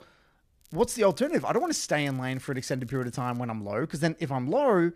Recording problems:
crackling; faint; from 0.5 to 3.5 s; 30 dB below the speech

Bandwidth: 14.5 kHz